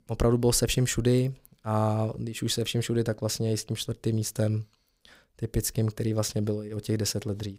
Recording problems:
none

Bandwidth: 15.5 kHz